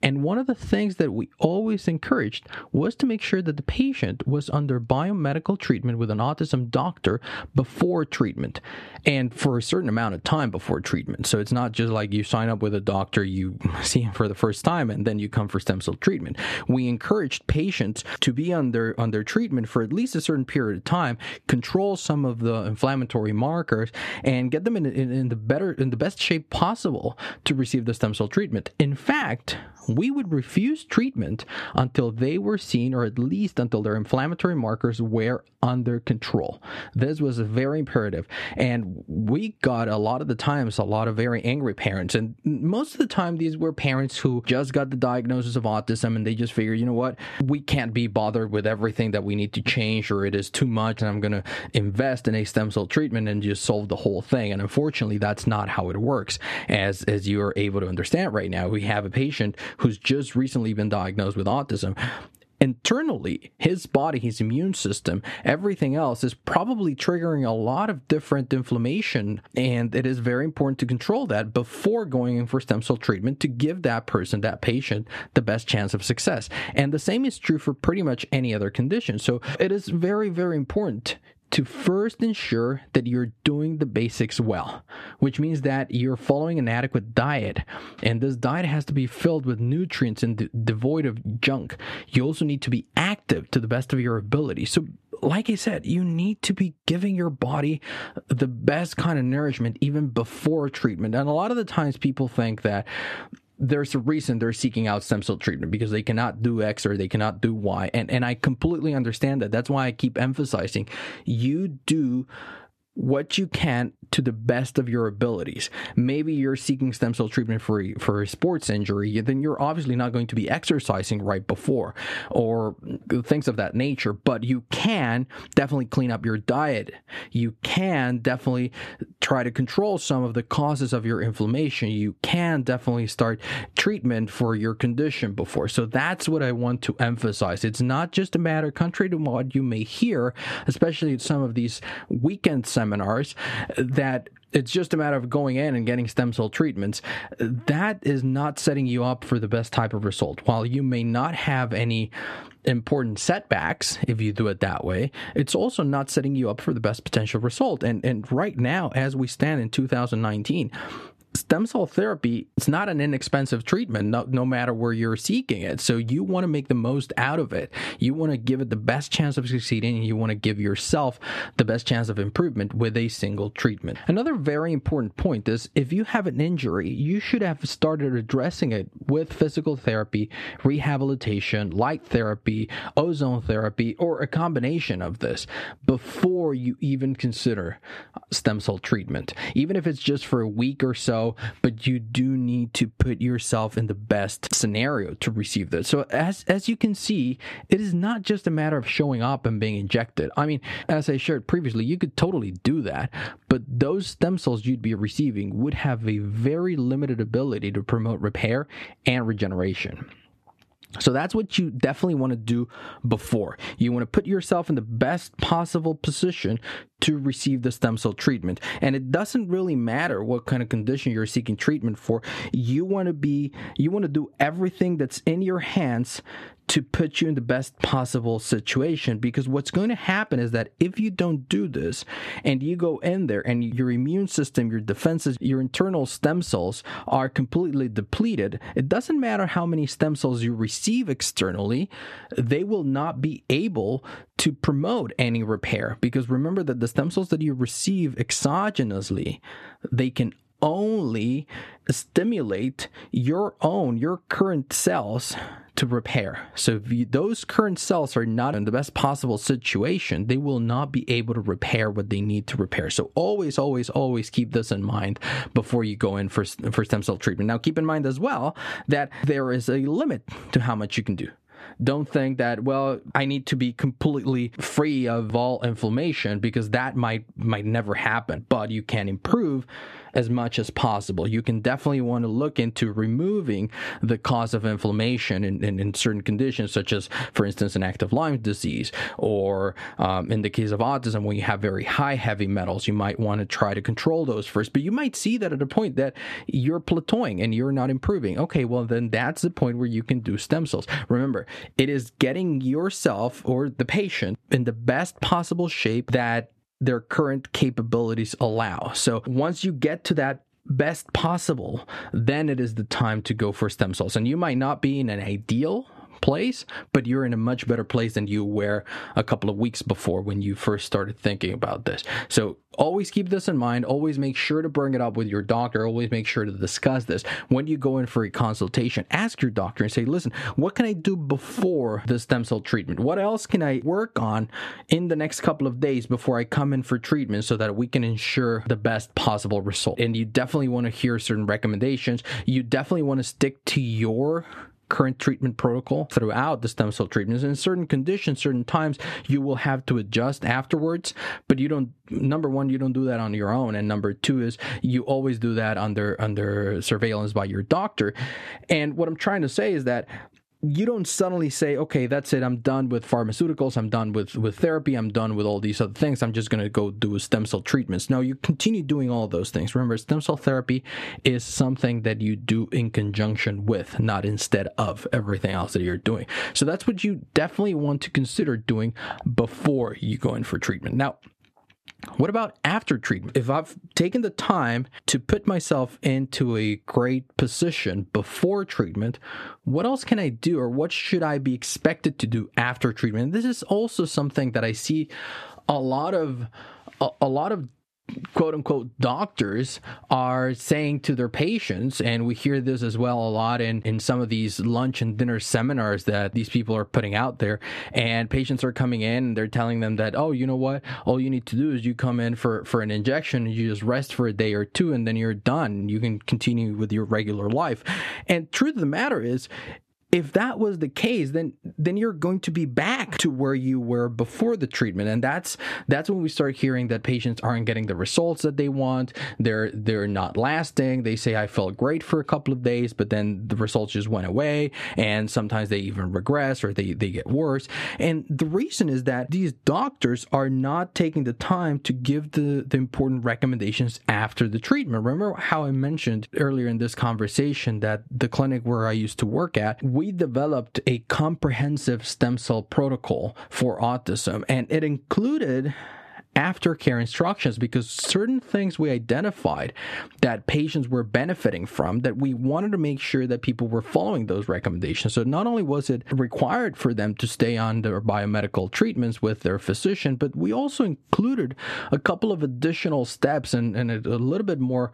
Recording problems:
squashed, flat; somewhat

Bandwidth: 13.5 kHz